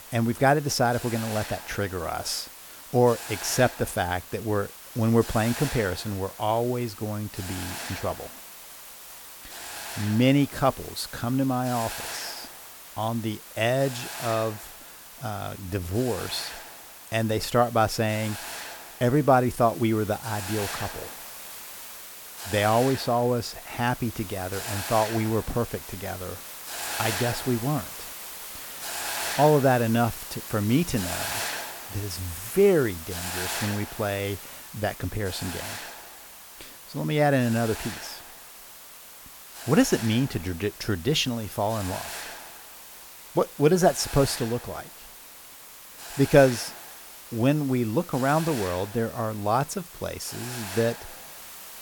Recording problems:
hiss; noticeable; throughout; 10 dB below the speech

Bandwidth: 18.5 kHz